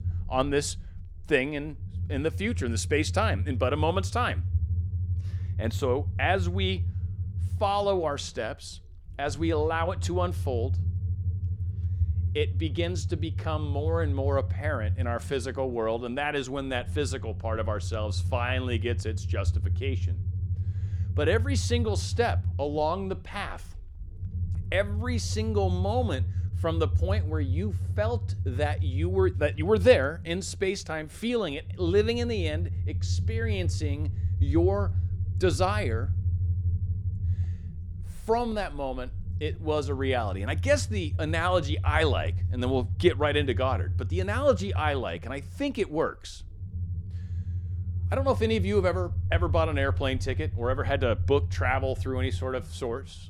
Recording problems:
low rumble; noticeable; throughout; 20 dB below the speech

